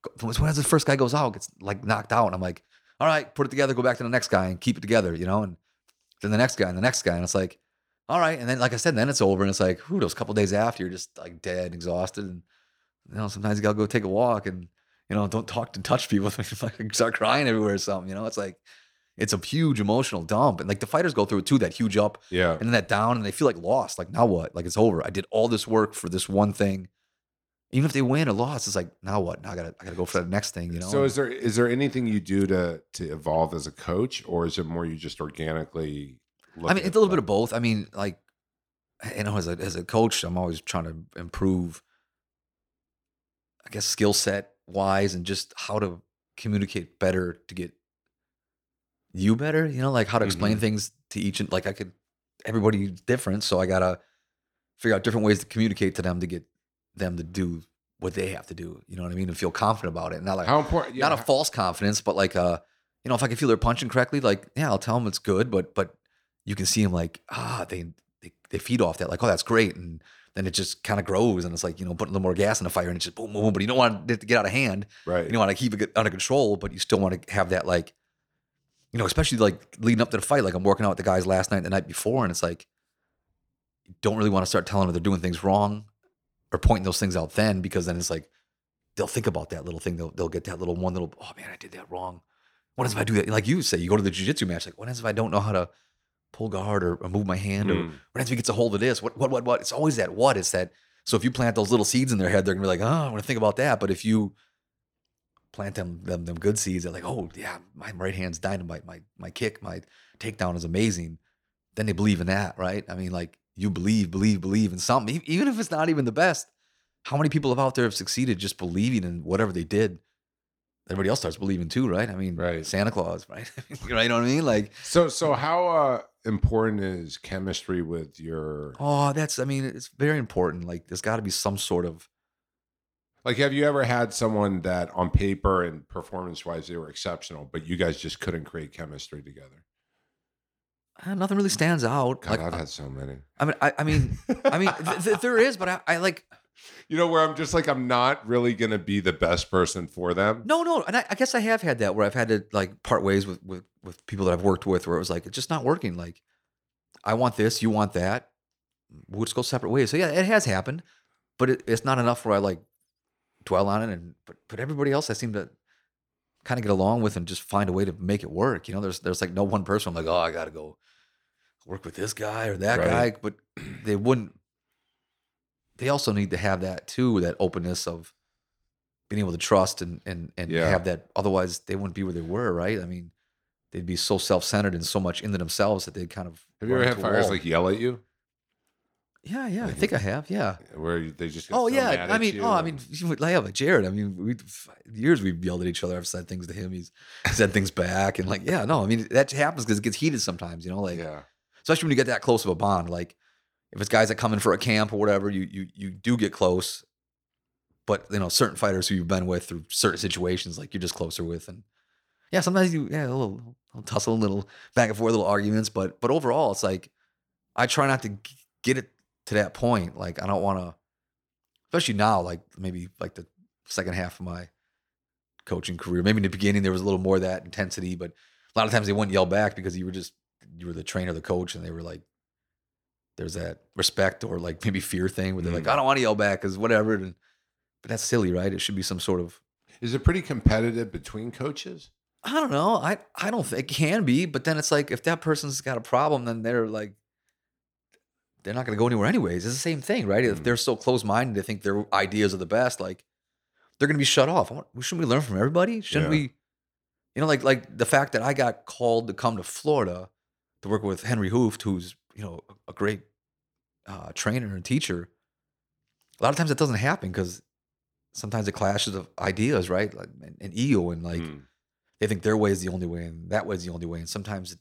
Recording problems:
none

